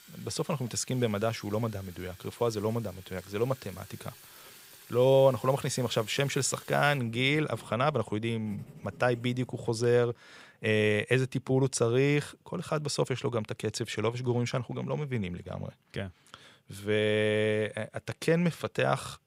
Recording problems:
household noises; faint; until 9.5 s; 20 dB below the speech

